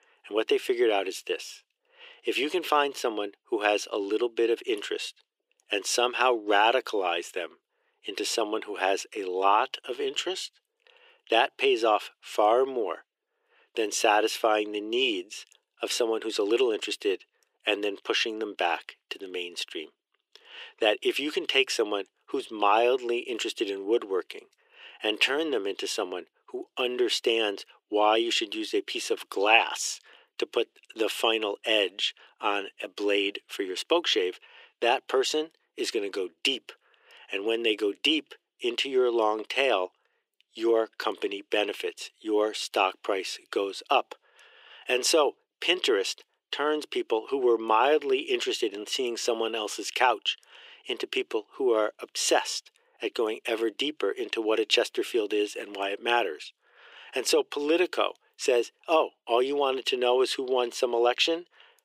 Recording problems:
thin; very; fading below 350 Hz

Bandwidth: 15.5 kHz